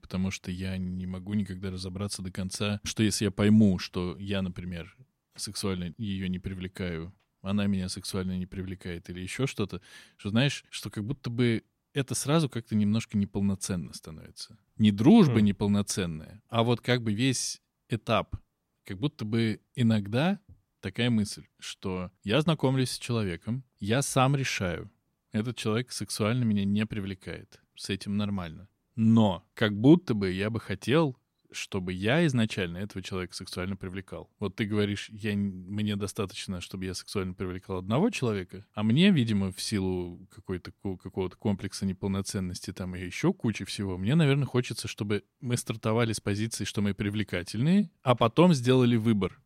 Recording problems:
none

